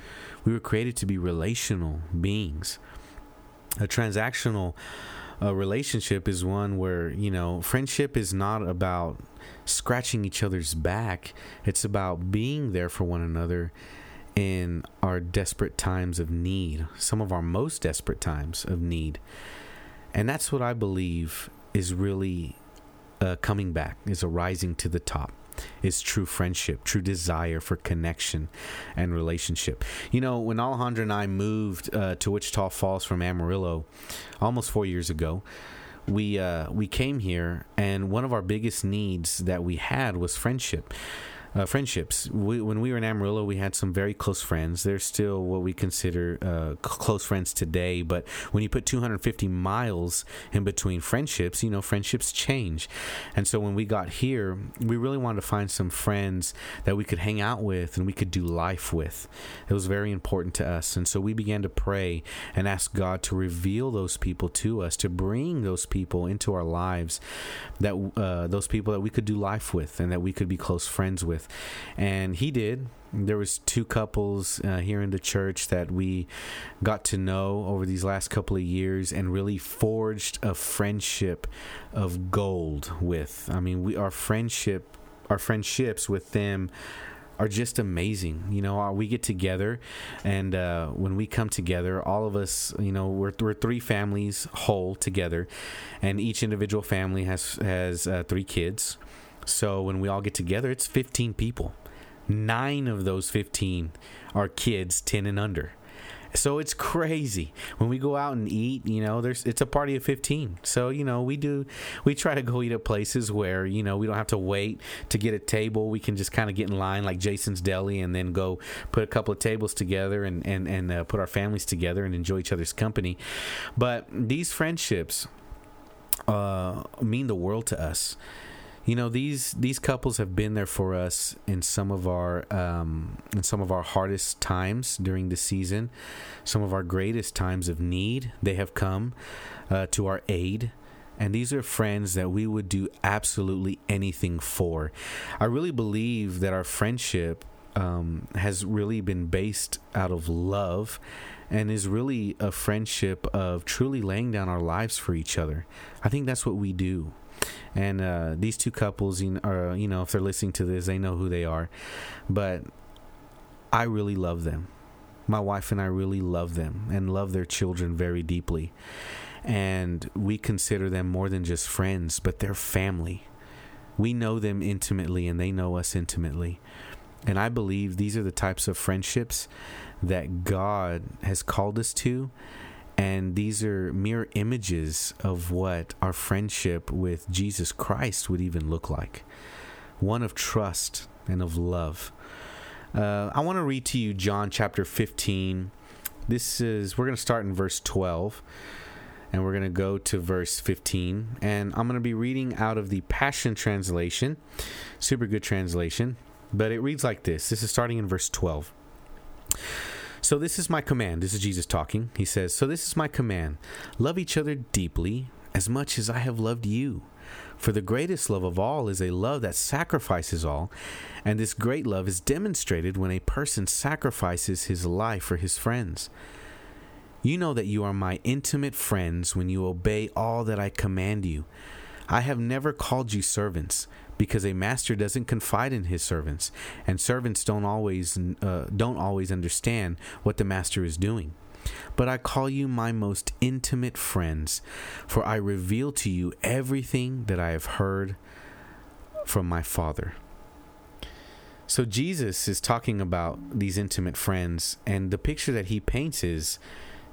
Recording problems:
squashed, flat; somewhat

